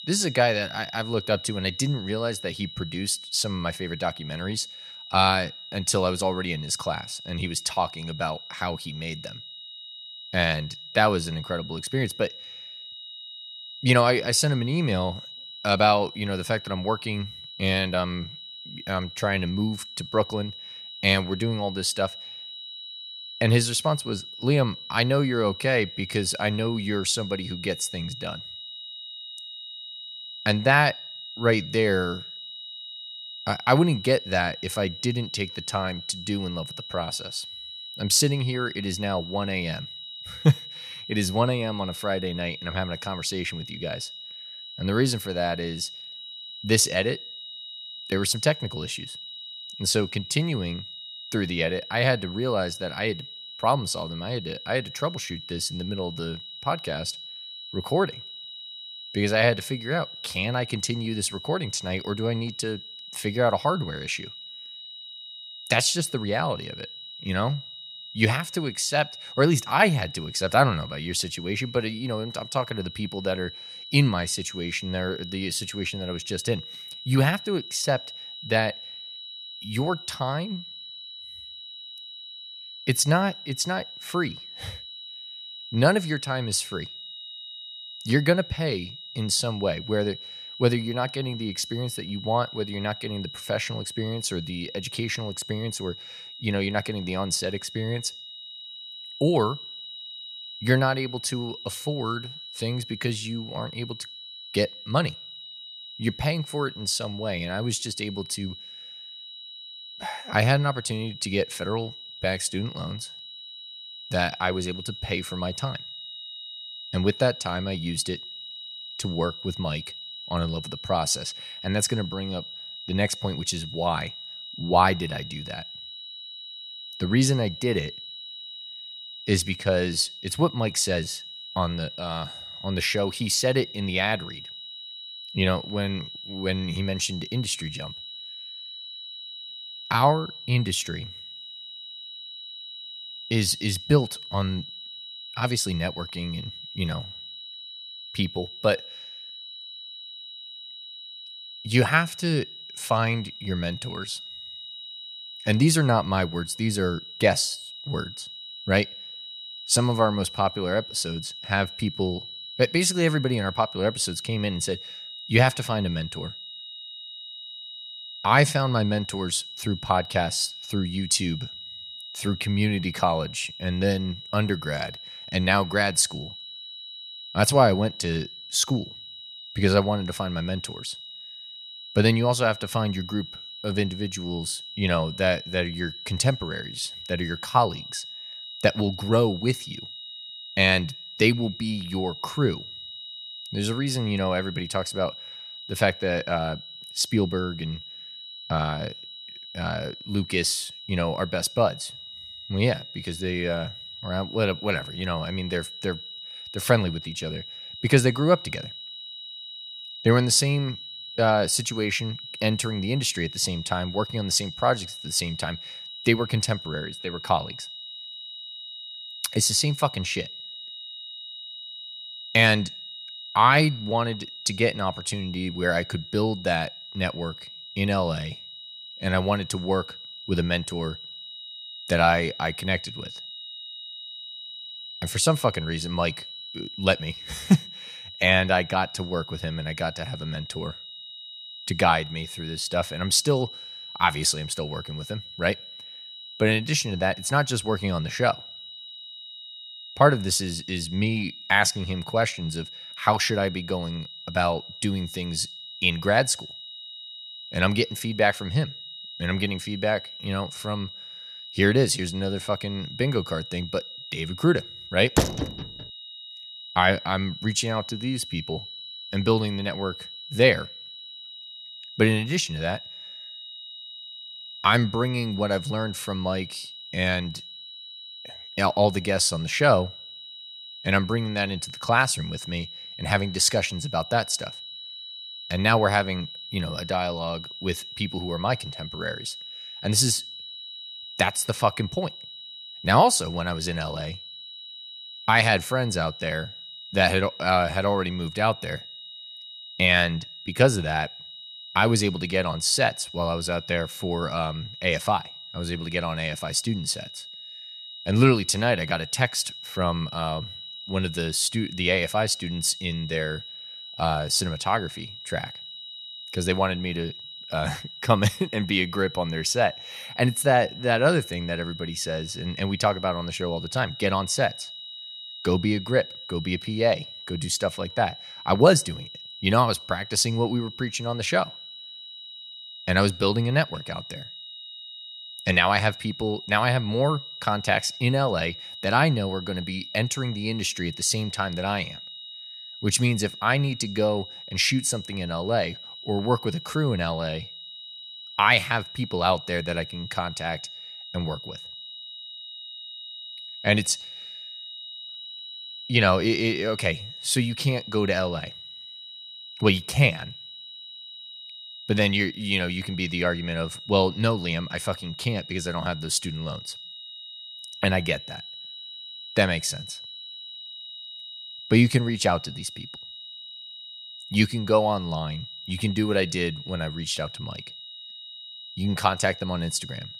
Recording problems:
high-pitched whine; noticeable; throughout; 4 kHz, 10 dB below the speech
door banging; loud; at 4:25; peak 1 dB above the speech

